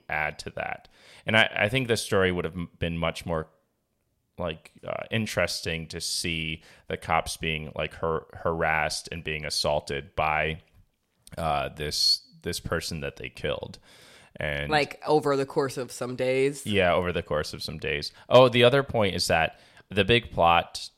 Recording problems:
none

